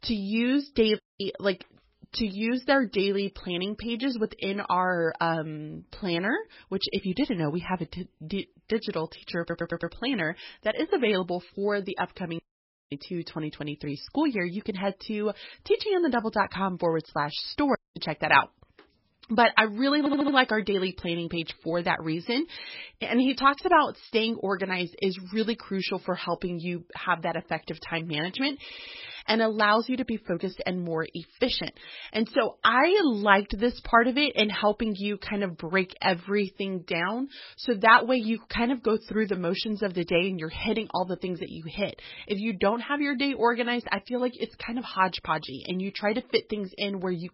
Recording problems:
garbled, watery; badly; nothing above 5.5 kHz
audio cutting out; at 1 s, at 12 s for 0.5 s and at 18 s
audio stuttering; at 9.5 s, at 20 s and at 29 s

